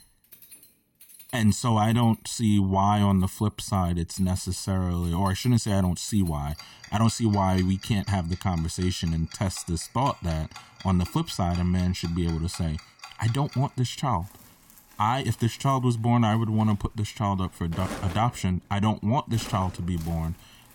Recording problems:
household noises; noticeable; throughout; 20 dB below the speech

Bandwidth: 17.5 kHz